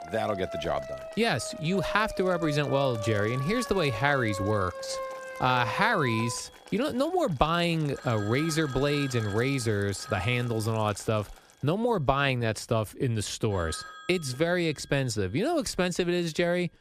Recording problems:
alarms or sirens; noticeable; throughout; 10 dB below the speech
household noises; faint; until 12 s; 25 dB below the speech

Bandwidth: 14.5 kHz